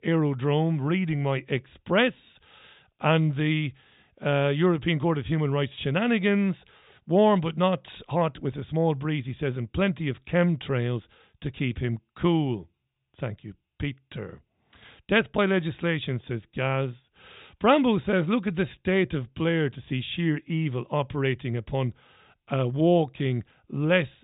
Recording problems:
high frequencies cut off; severe; nothing above 4 kHz

